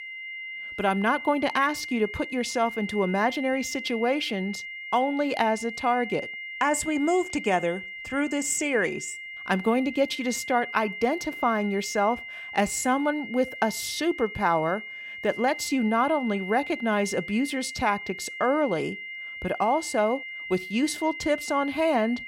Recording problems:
high-pitched whine; loud; throughout; 2 kHz, 9 dB below the speech

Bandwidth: 16 kHz